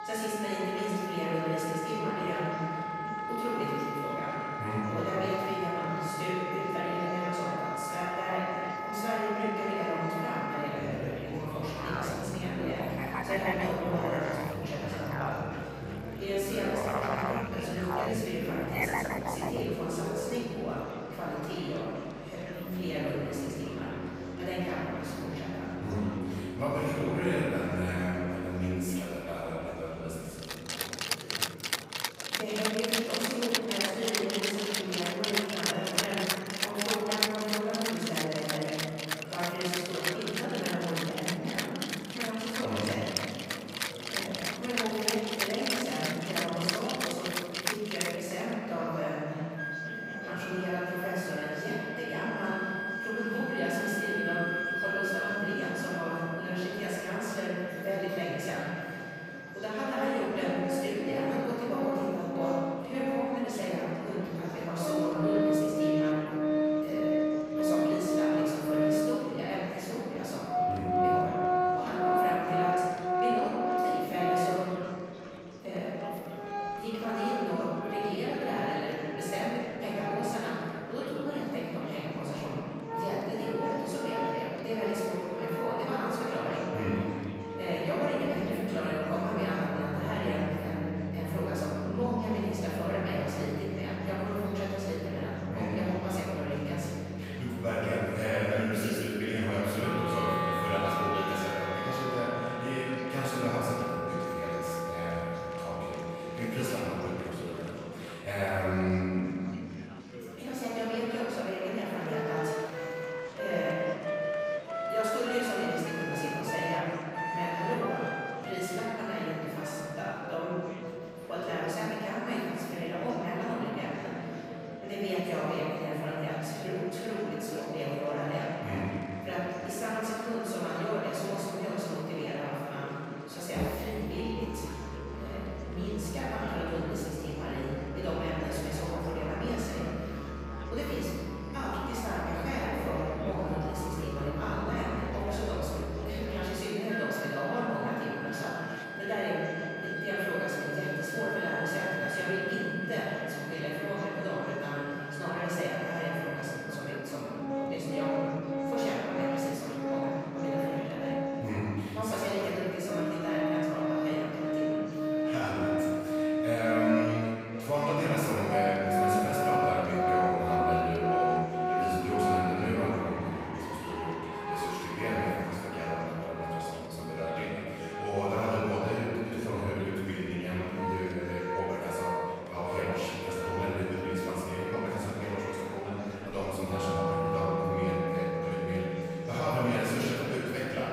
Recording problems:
room echo; strong; dies away in 2.5 s
off-mic speech; far
background music; loud; throughout; 1 dB below the speech
murmuring crowd; noticeable; throughout; 15 dB below the speech

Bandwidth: 15.5 kHz